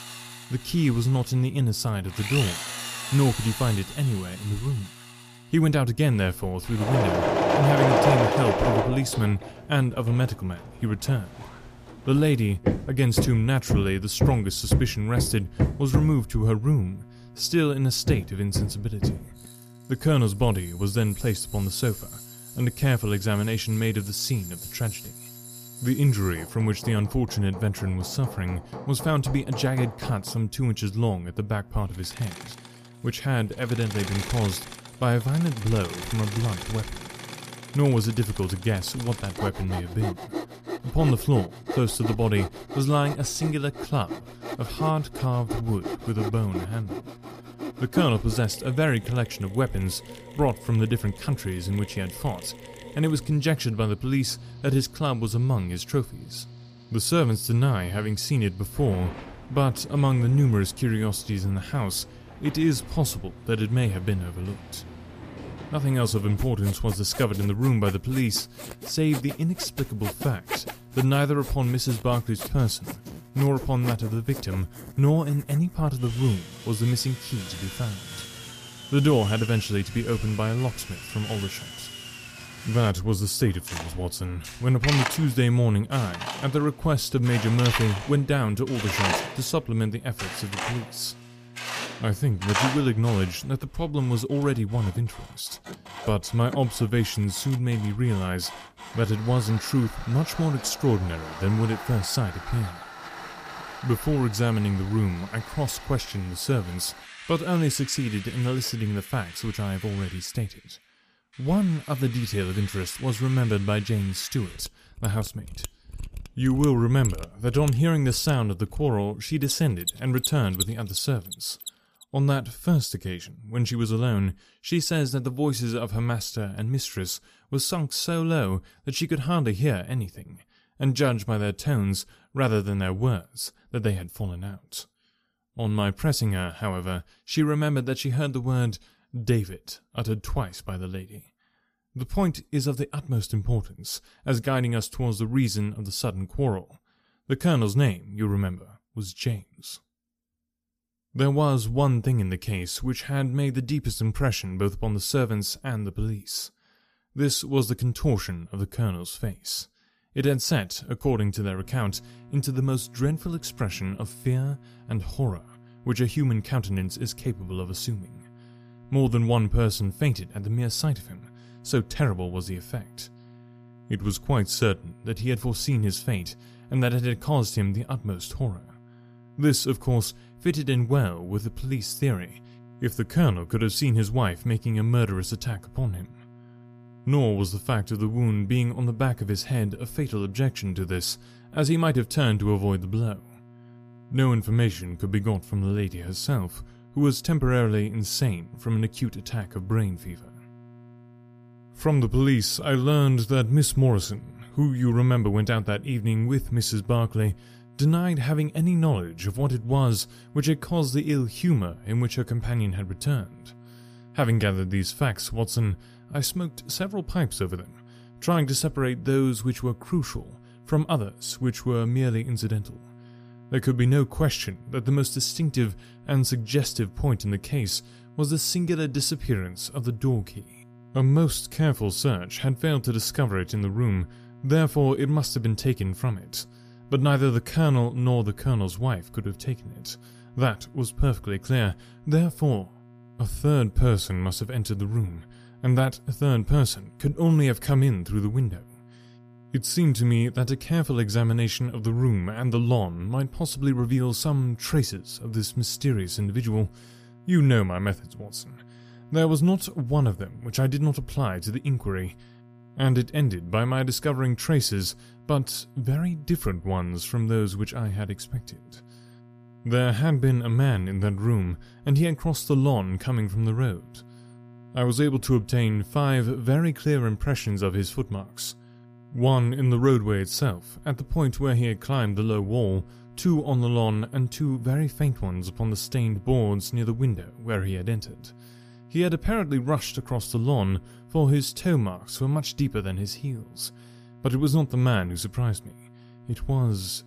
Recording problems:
machinery noise; loud; until 2:01; 8 dB below the speech
electrical hum; faint; until 1:33 and from 2:42 on; 60 Hz, 25 dB below the speech

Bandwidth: 14.5 kHz